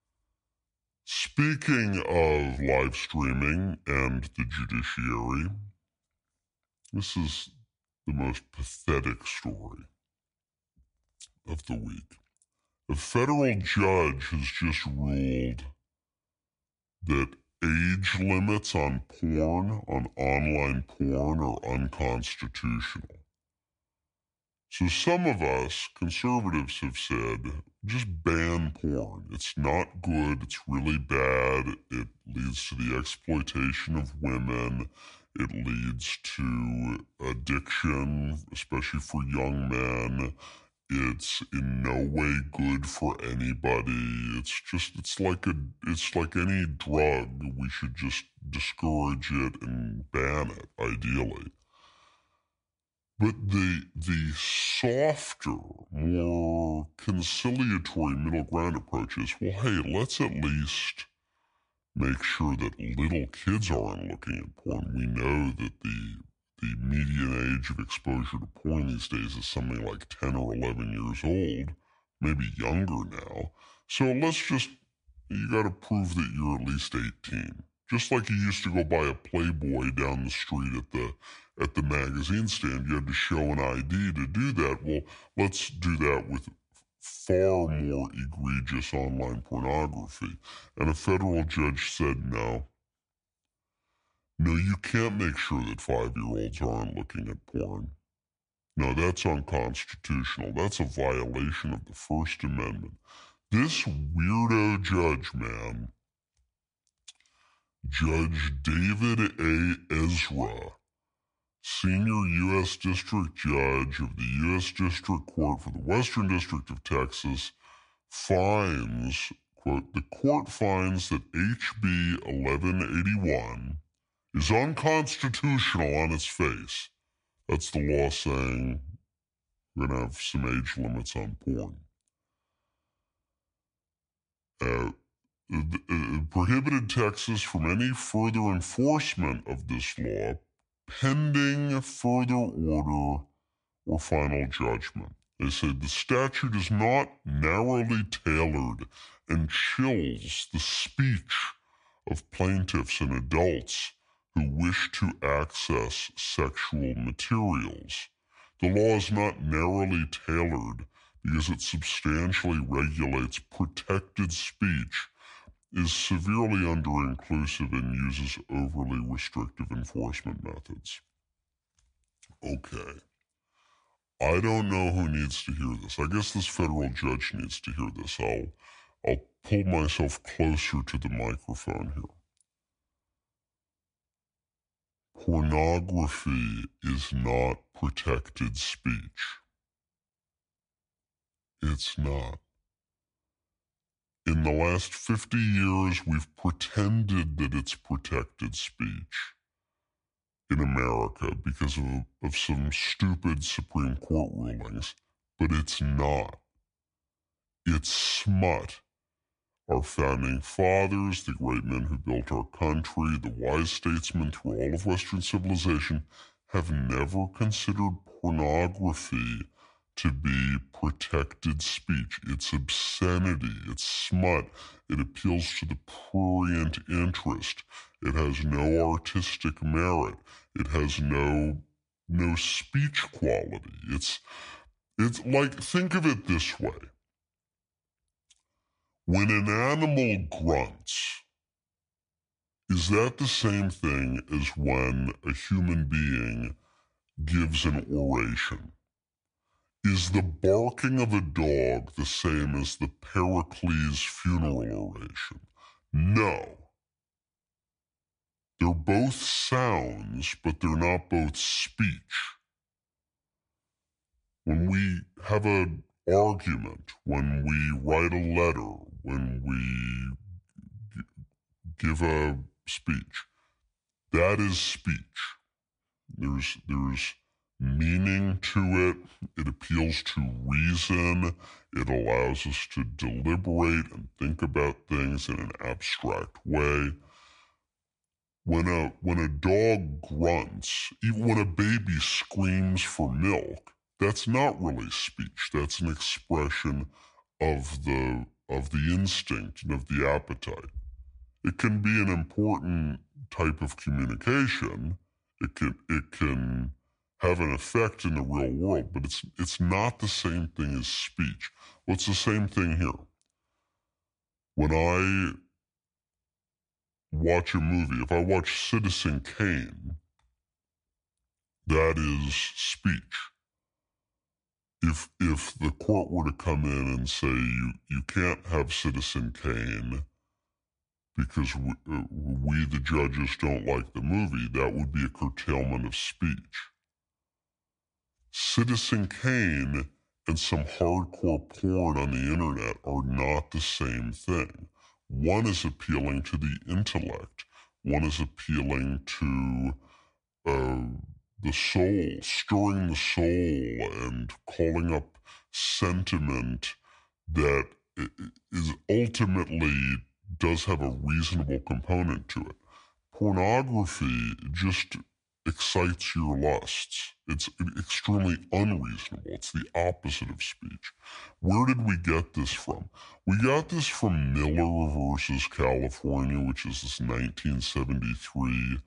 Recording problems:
wrong speed and pitch; too slow and too low; 0.7 times normal speed

